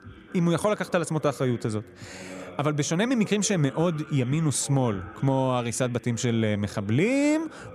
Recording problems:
voice in the background; noticeable; throughout; 20 dB below the speech

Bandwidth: 15 kHz